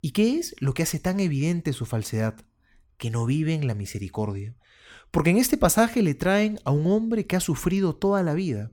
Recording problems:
none

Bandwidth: 17.5 kHz